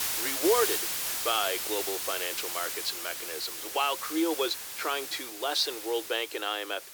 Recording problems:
thin; very; fading below 300 Hz
hiss; loud; throughout; 1 dB below the speech

